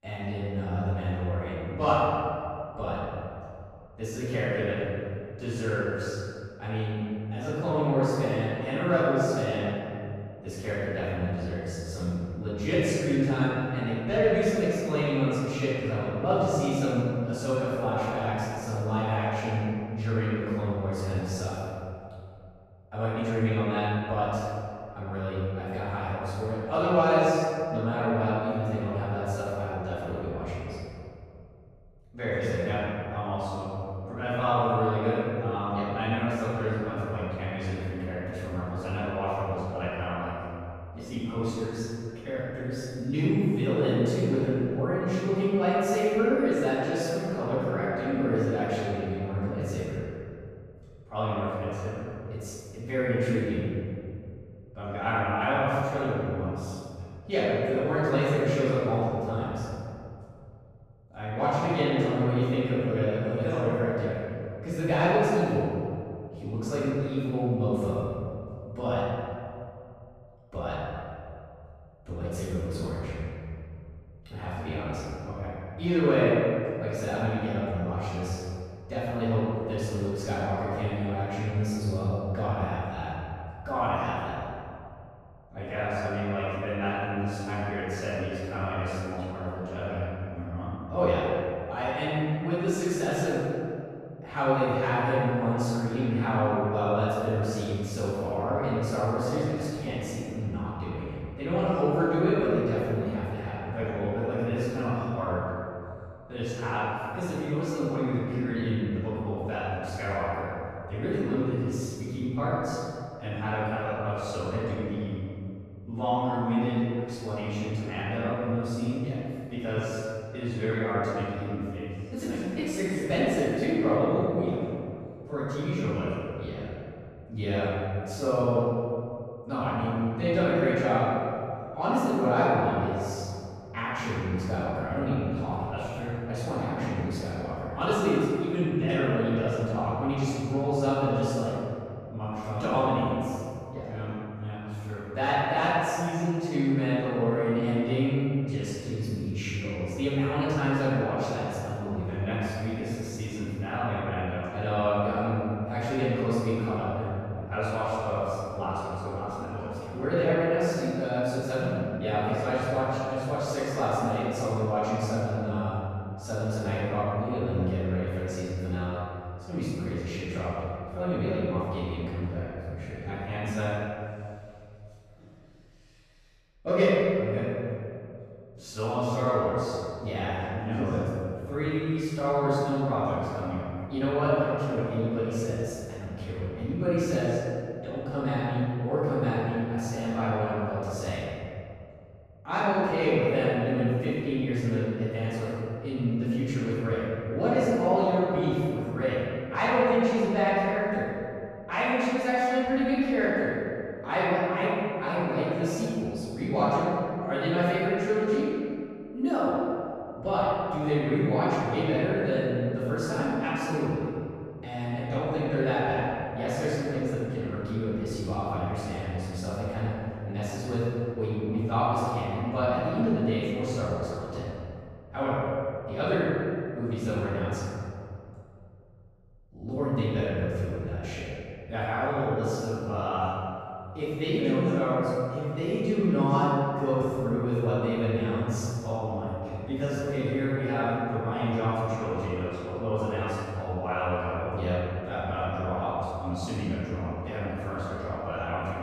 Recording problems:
room echo; strong; dies away in 2.3 s
off-mic speech; far

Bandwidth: 14.5 kHz